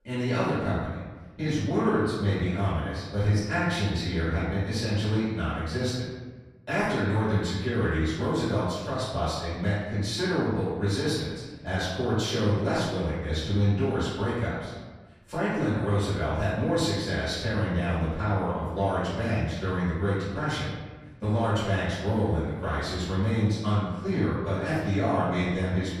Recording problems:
room echo; strong; dies away in 1.3 s
off-mic speech; far

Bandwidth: 14.5 kHz